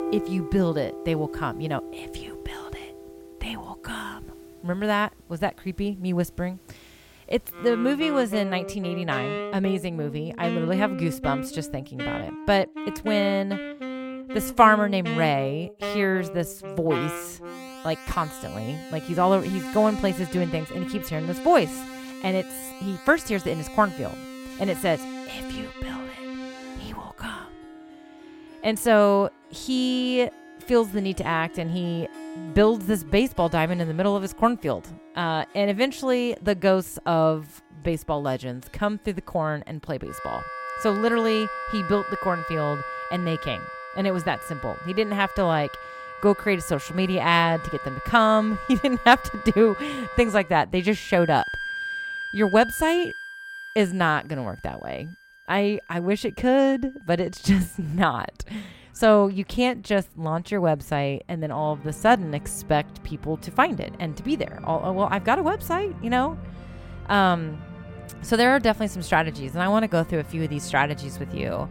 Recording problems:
background music; noticeable; throughout; 10 dB below the speech

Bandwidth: 16.5 kHz